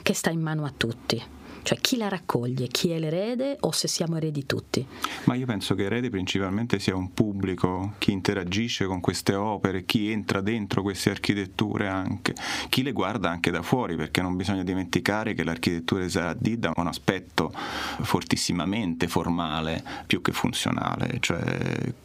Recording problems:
squashed, flat; heavily

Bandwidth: 15.5 kHz